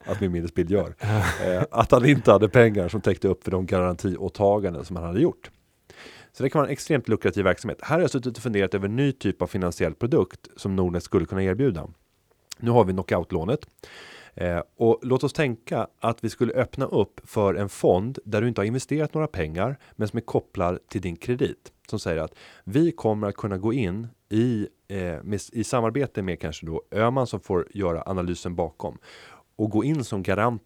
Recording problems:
none

